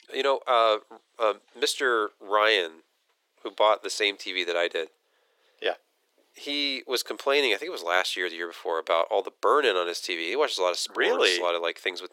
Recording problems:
thin; very; fading below 400 Hz

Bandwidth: 16.5 kHz